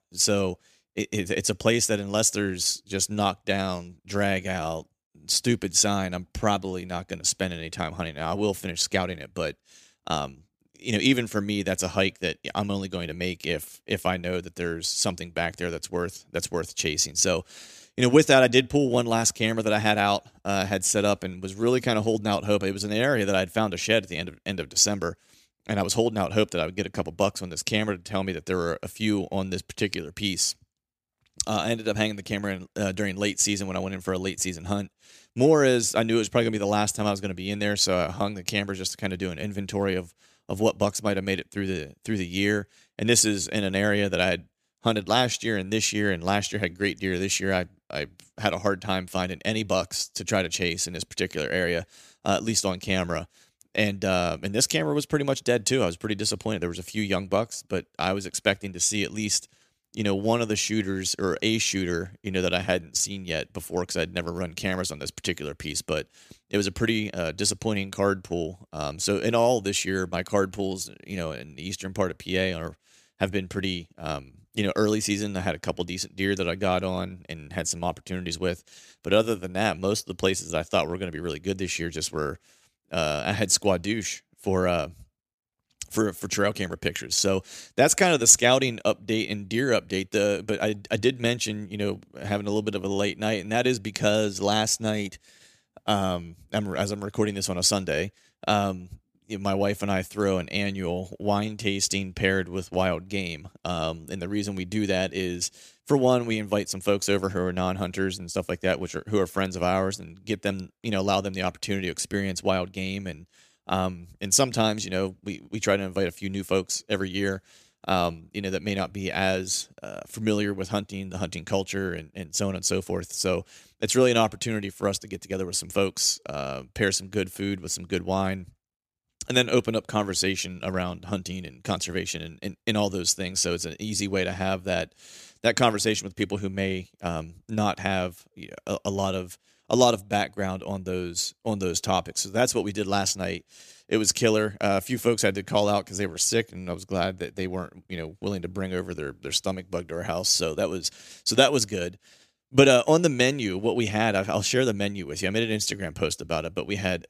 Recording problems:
none

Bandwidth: 15 kHz